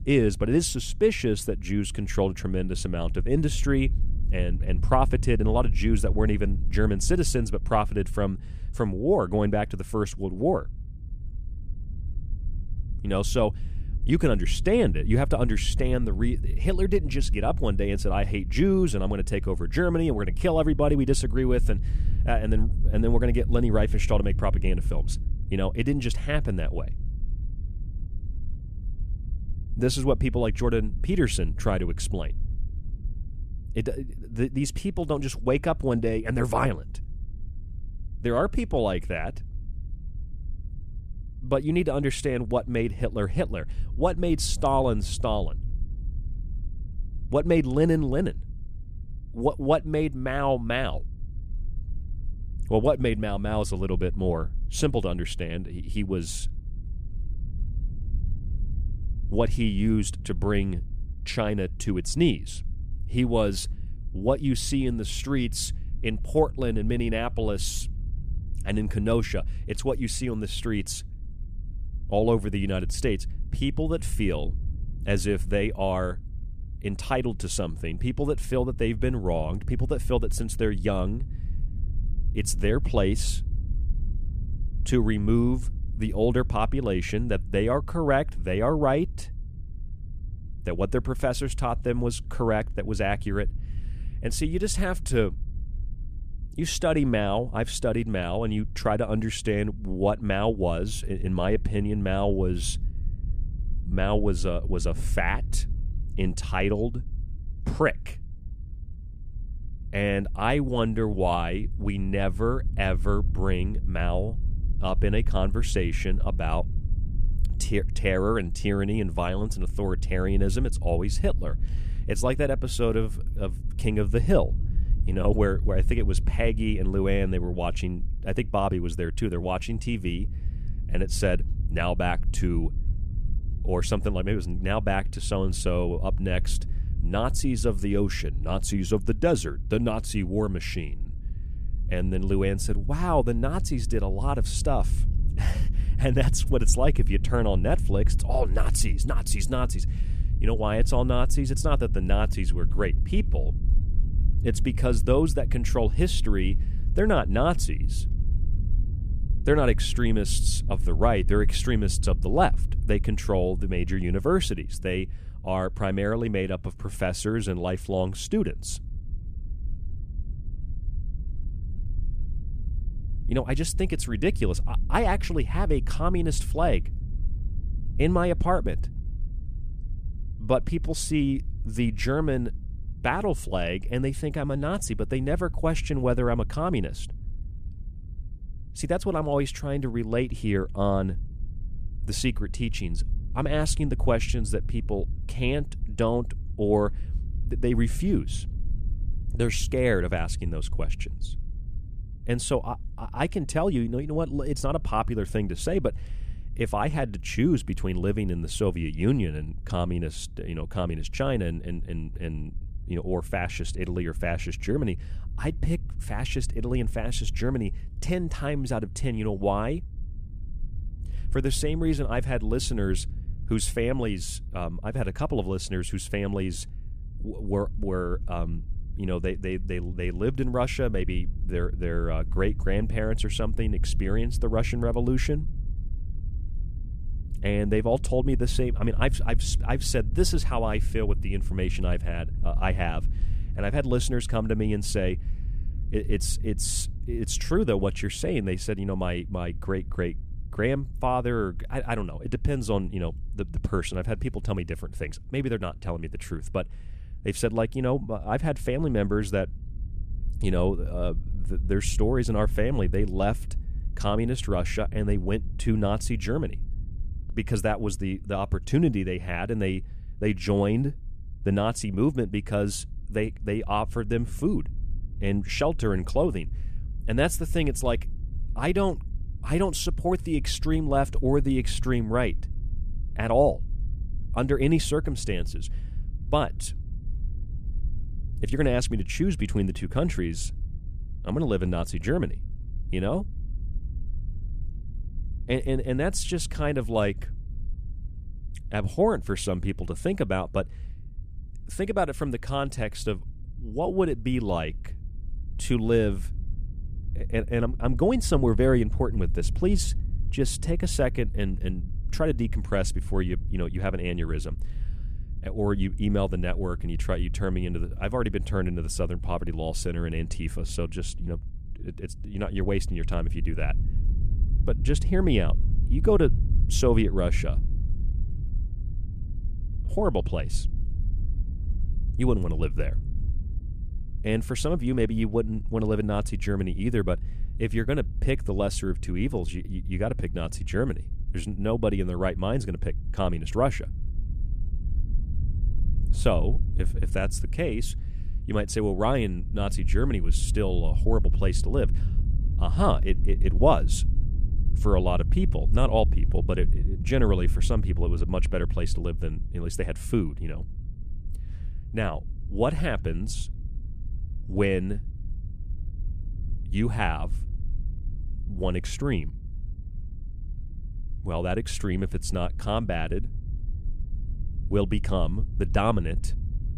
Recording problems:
low rumble; faint; throughout; 20 dB below the speech

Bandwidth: 14.5 kHz